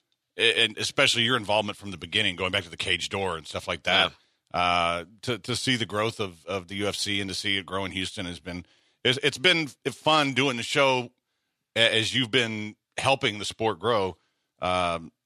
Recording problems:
thin; somewhat; fading below 500 Hz

